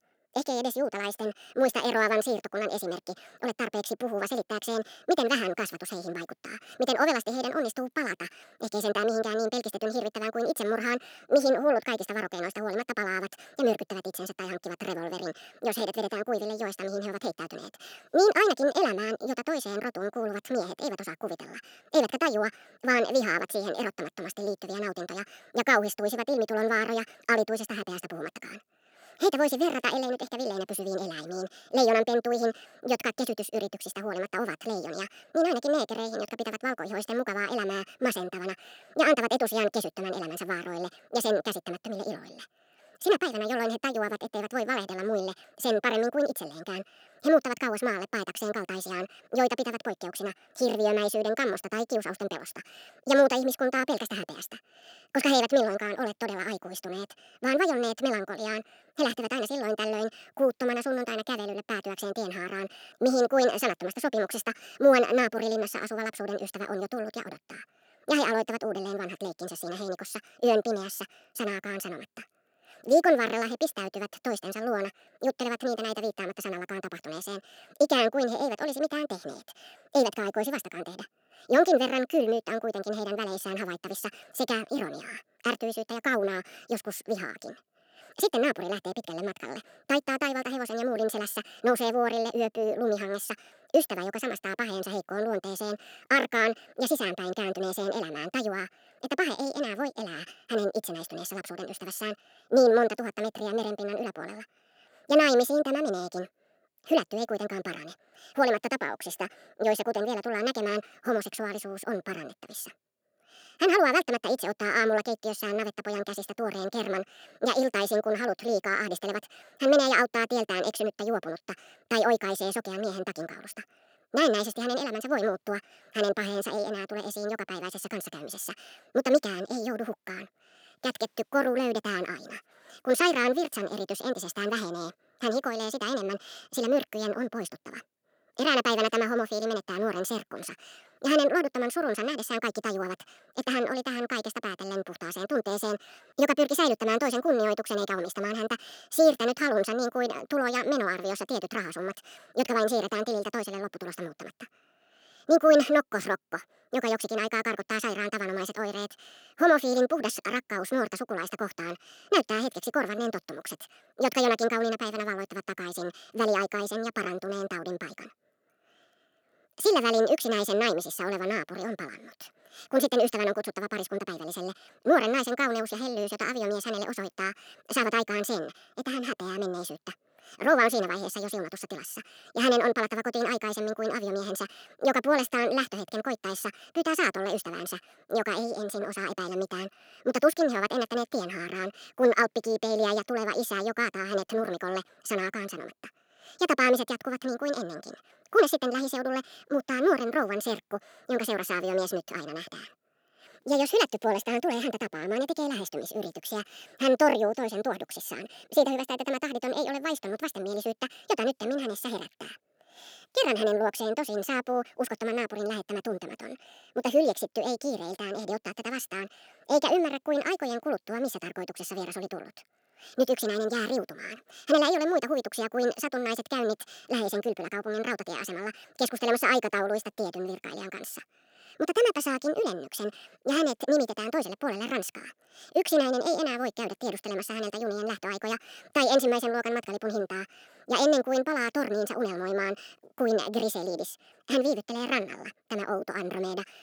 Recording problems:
wrong speed and pitch; too fast and too high; 1.6 times normal speed

